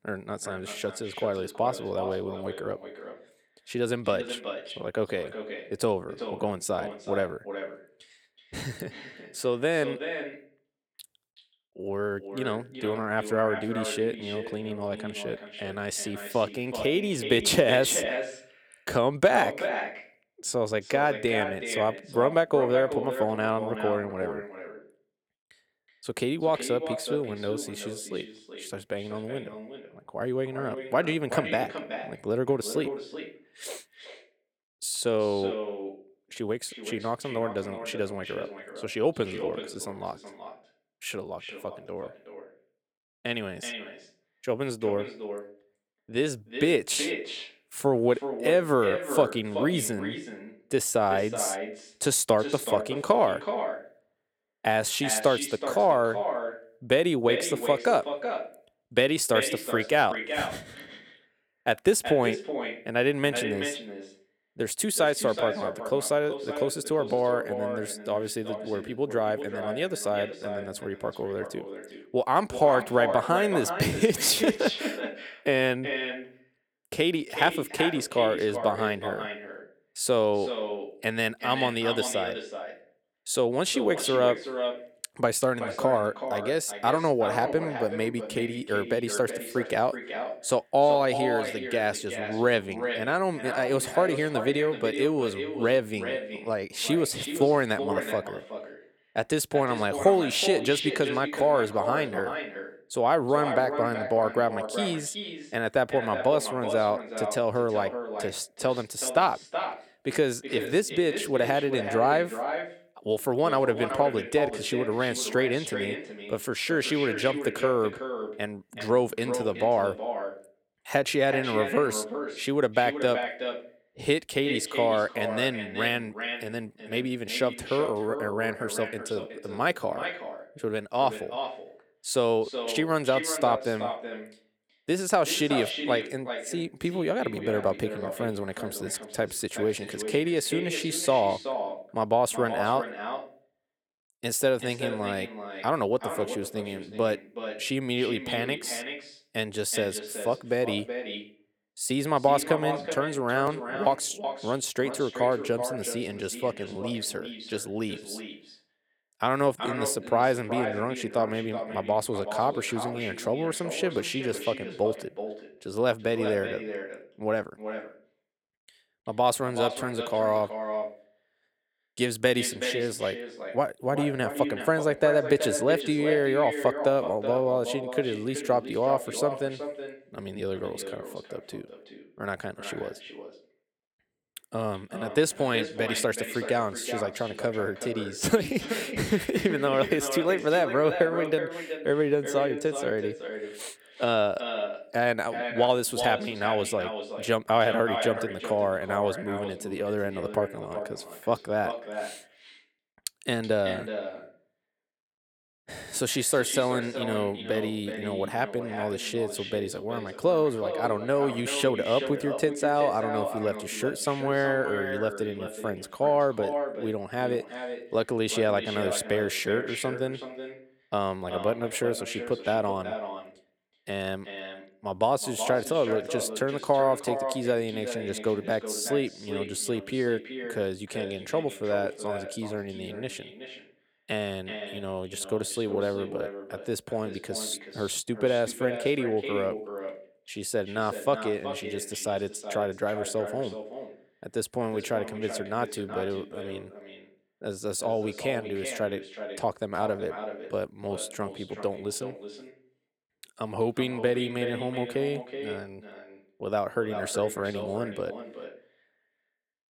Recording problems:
echo of what is said; strong; throughout; 370 ms later, 8 dB below the speech

